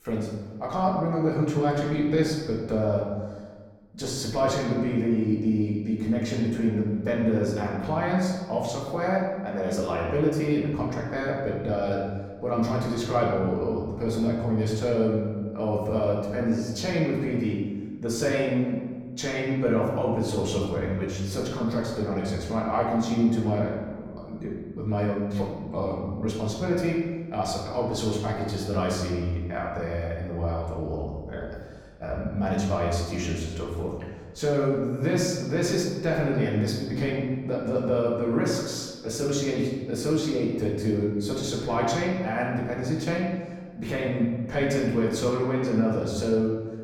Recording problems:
off-mic speech; far
room echo; noticeable; dies away in 1.3 s

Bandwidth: 18 kHz